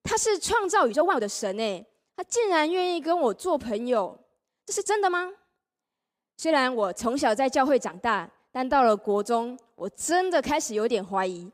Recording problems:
uneven, jittery; strongly; from 0.5 to 10 s

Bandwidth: 15.5 kHz